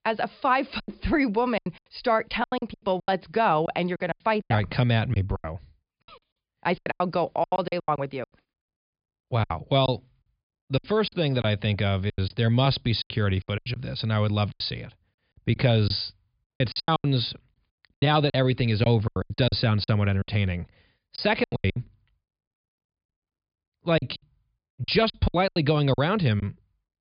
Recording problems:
high frequencies cut off; severe; nothing above 5 kHz
choppy; very; 17% of the speech affected

